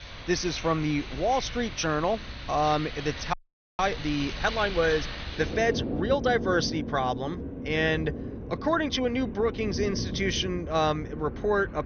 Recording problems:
garbled, watery; slightly; nothing above 6.5 kHz
rain or running water; loud; throughout; 8 dB below the speech
crackling; faint; at 4 s; 25 dB below the speech
audio freezing; at 3.5 s

